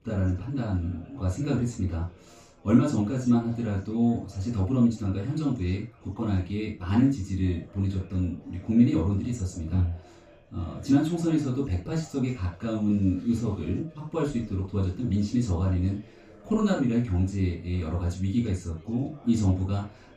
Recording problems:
off-mic speech; far
room echo; noticeable; dies away in 0.2 s
background chatter; faint; throughout; 3 voices, 25 dB below the speech

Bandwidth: 15 kHz